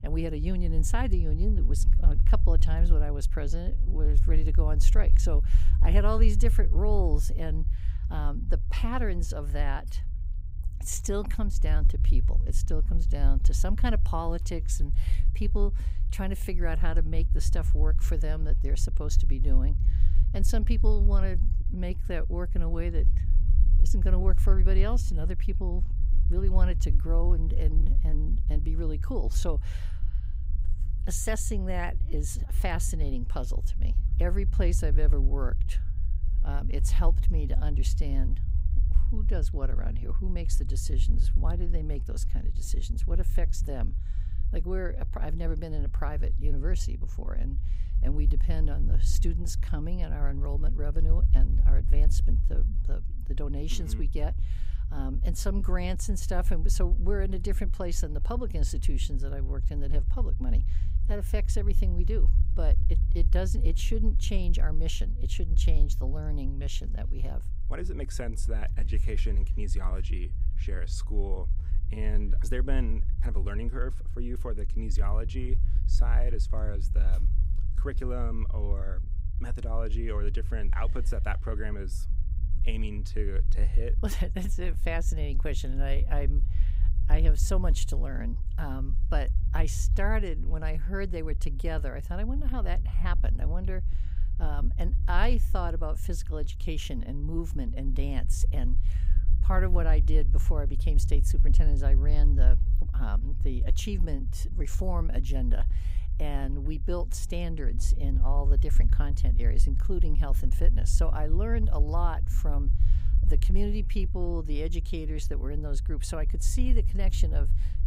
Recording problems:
low rumble; noticeable; throughout; 10 dB below the speech

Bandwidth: 15.5 kHz